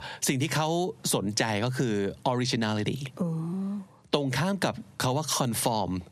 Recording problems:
squashed, flat; heavily

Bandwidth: 14.5 kHz